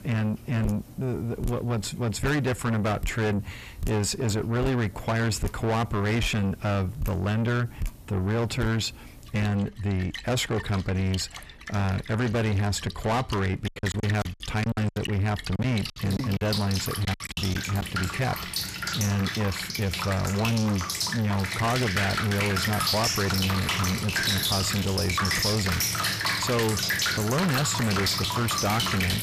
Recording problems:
distortion; heavy; 6 dB below the speech
rain or running water; loud; throughout; 1 dB below the speech
choppy; very; from 14 to 18 s; 14% of the speech affected

